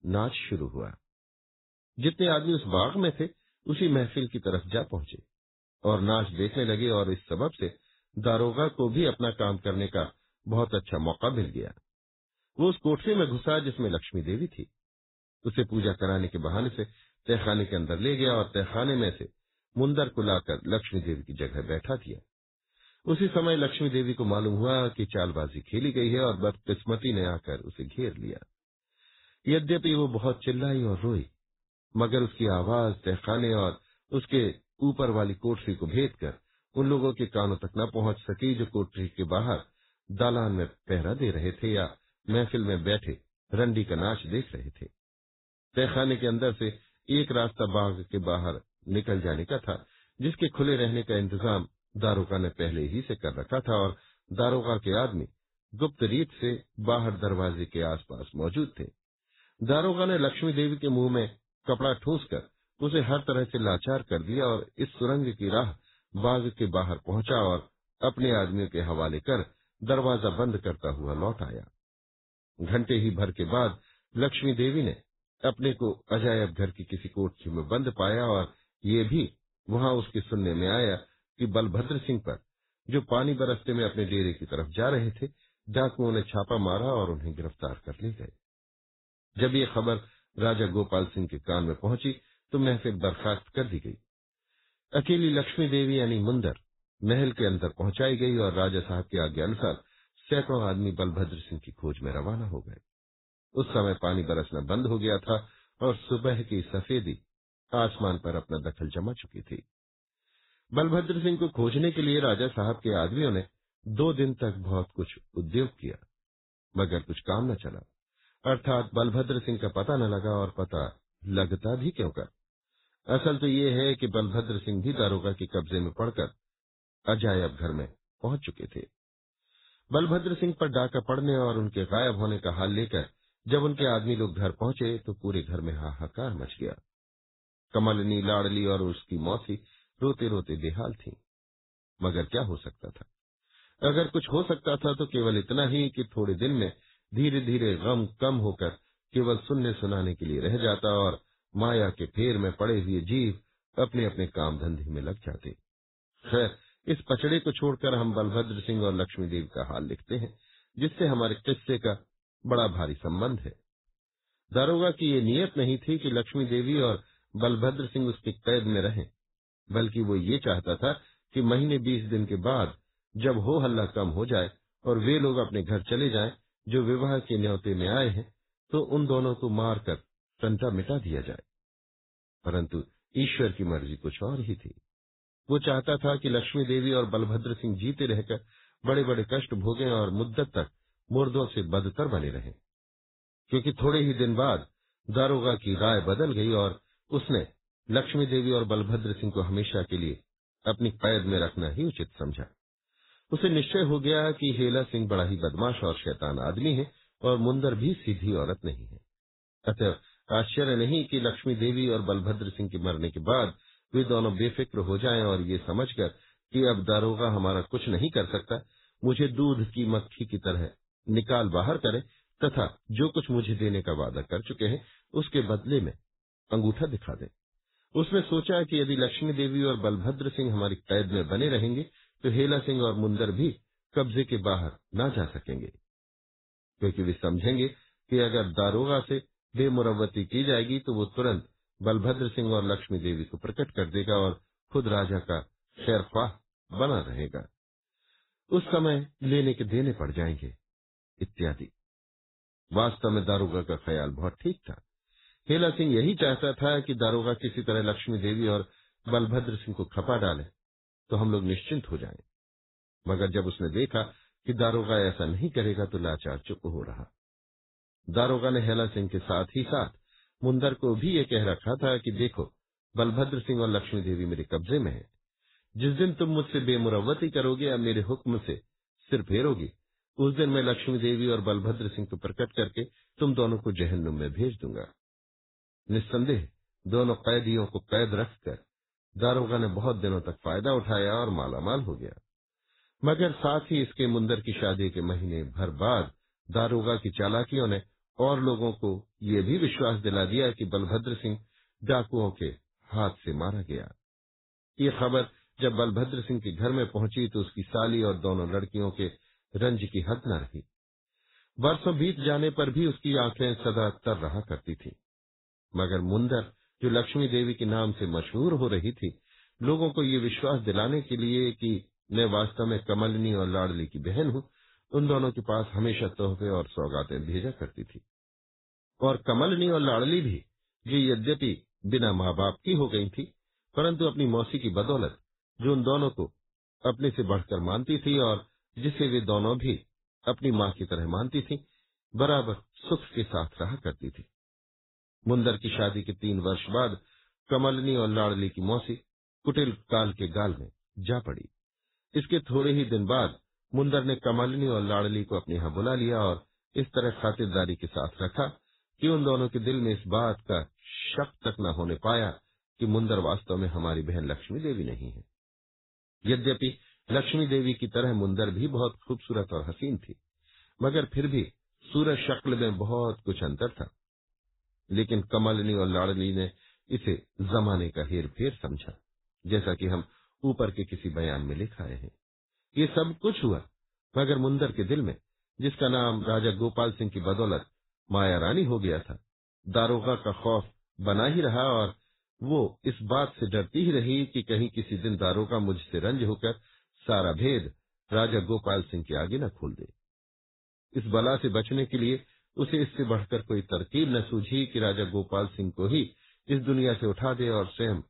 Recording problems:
garbled, watery; badly; nothing above 4 kHz

